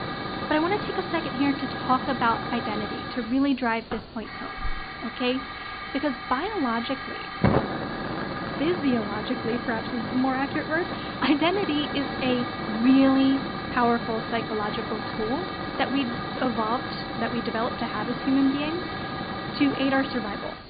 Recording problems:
high frequencies cut off; severe; nothing above 4.5 kHz
hiss; loud; throughout; 5 dB below the speech

